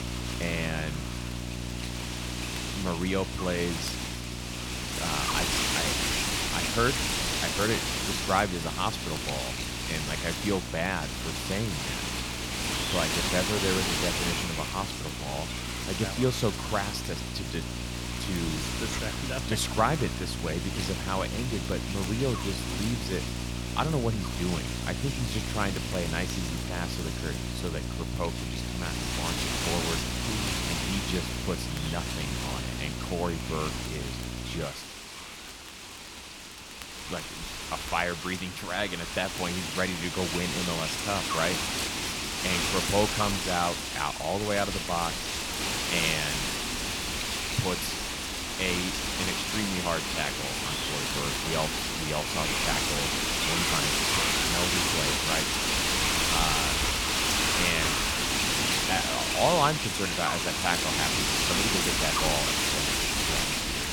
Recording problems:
wind noise on the microphone; heavy; 3 dB above the speech
electrical hum; noticeable; until 35 s; 60 Hz, 15 dB below the speech
crackle, like an old record; faint; 20 dB below the speech

